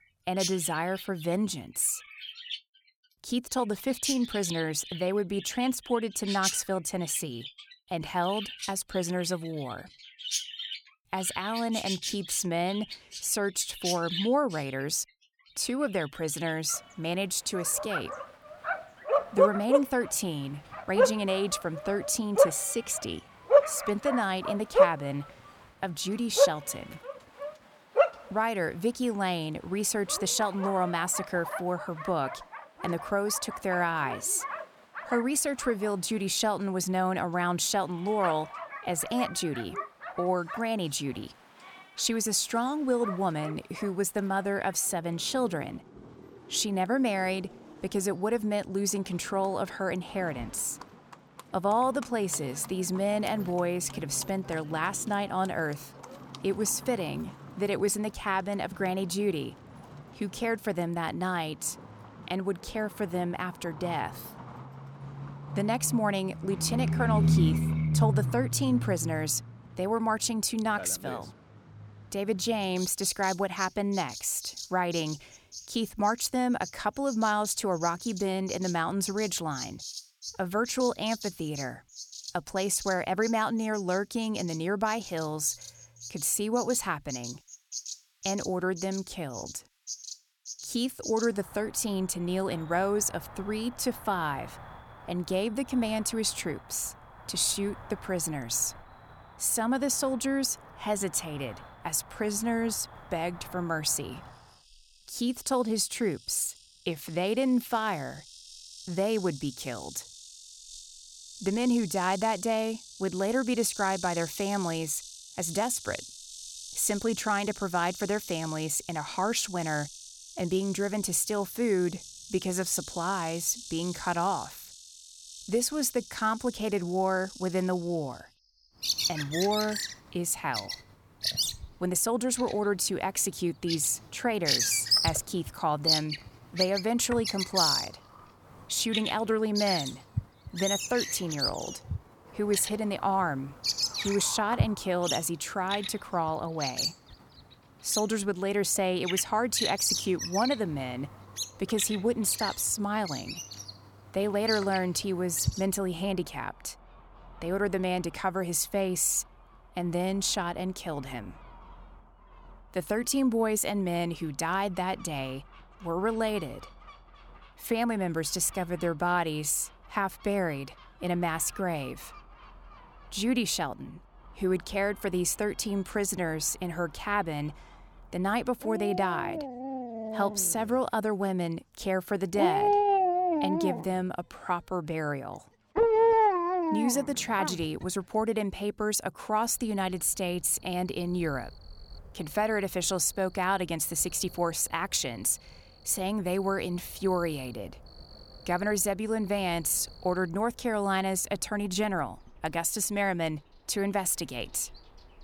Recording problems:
animal sounds; loud; throughout; 4 dB below the speech

